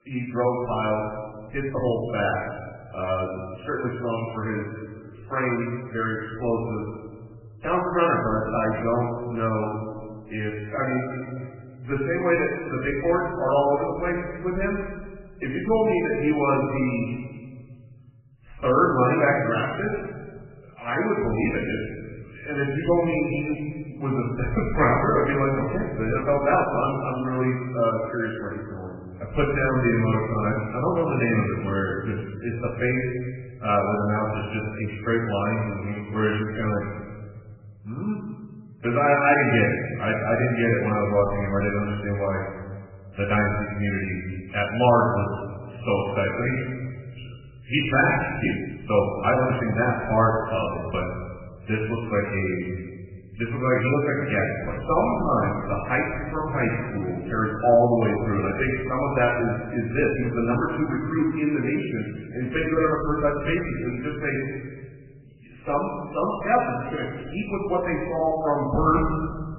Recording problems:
off-mic speech; far
garbled, watery; badly; nothing above 2.5 kHz
room echo; noticeable; dies away in 1.4 s
uneven, jittery; strongly; from 1.5 s to 1:07

